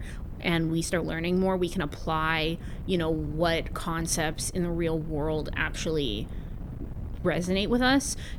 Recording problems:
wind noise on the microphone; occasional gusts; 20 dB below the speech
uneven, jittery; slightly; from 0.5 to 7.5 s

